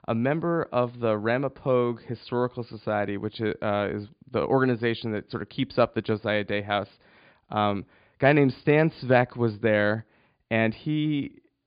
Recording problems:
high frequencies cut off; severe; nothing above 5 kHz

